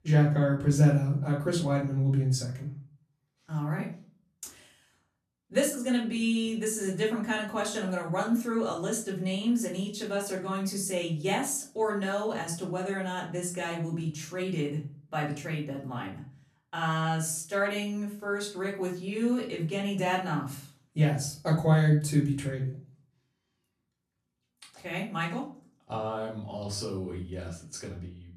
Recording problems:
off-mic speech; far
room echo; slight; dies away in 0.4 s

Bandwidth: 13.5 kHz